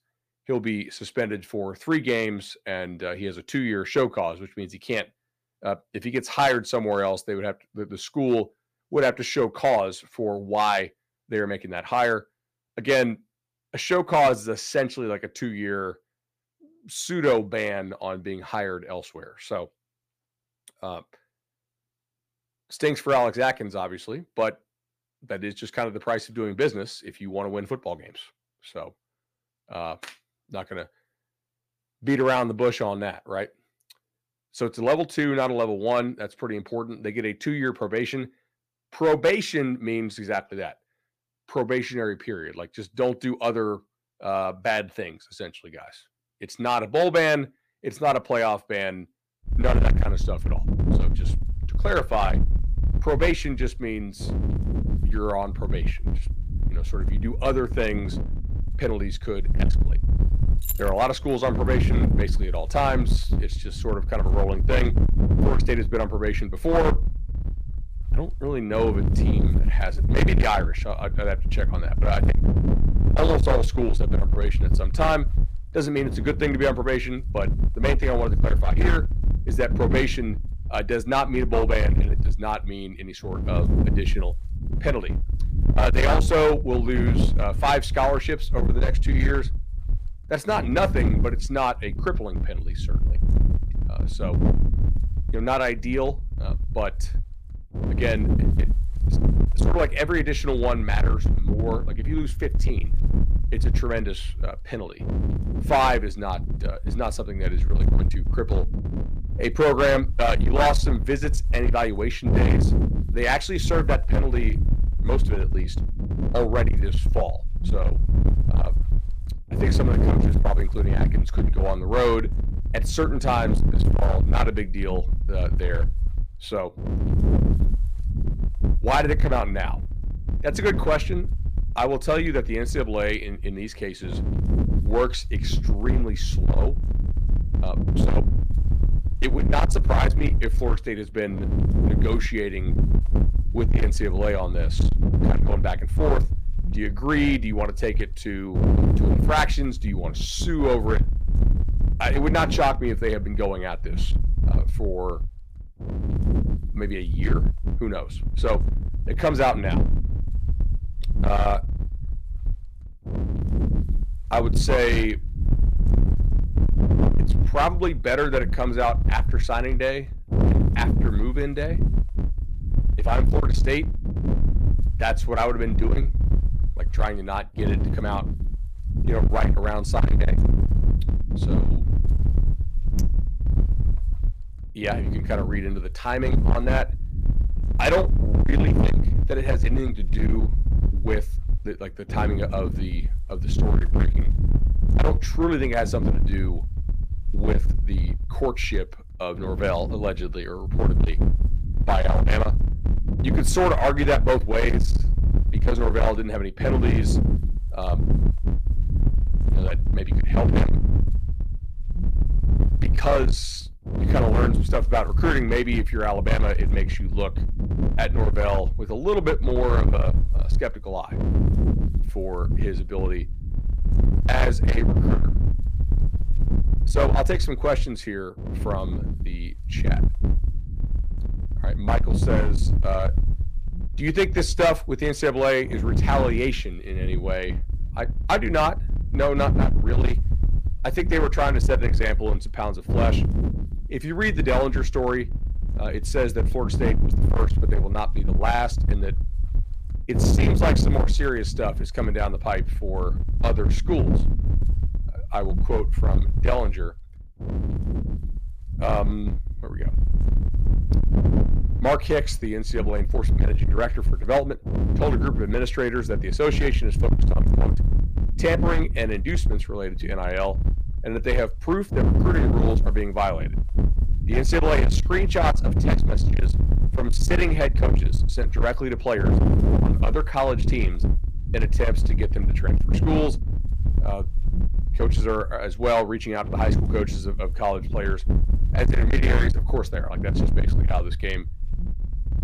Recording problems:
distortion; slight; 13% of the sound clipped
wind noise on the microphone; heavy; from 50 s on; 9 dB below the speech
jangling keys; noticeable; at 1:01; peak 5 dB below the speech
clattering dishes; faint; from 3:03 to 3:04; peak 15 dB below the speech

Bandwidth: 15 kHz